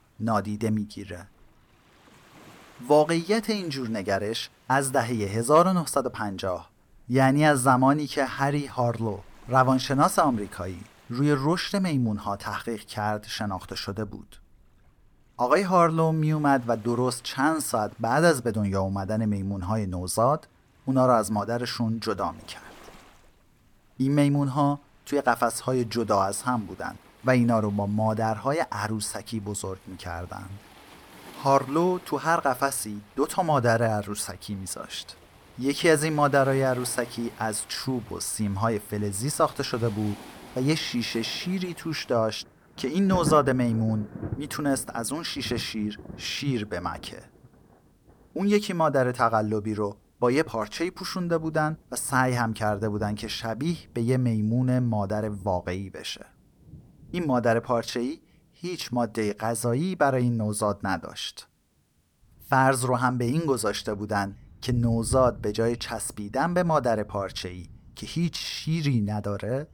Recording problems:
rain or running water; noticeable; throughout; 20 dB below the speech

